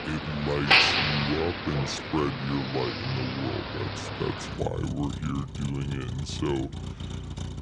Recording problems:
wrong speed and pitch; too slow and too low; 0.7 times normal speed
traffic noise; very loud; throughout; 3 dB above the speech

